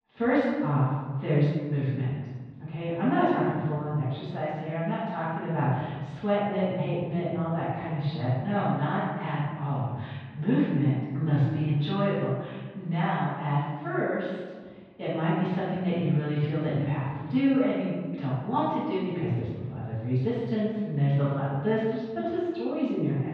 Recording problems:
room echo; strong; dies away in 1.3 s
off-mic speech; far
muffled; very; fading above 3.5 kHz

